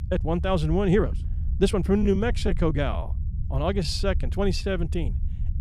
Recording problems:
low rumble; noticeable; throughout; 20 dB below the speech
uneven, jittery; strongly

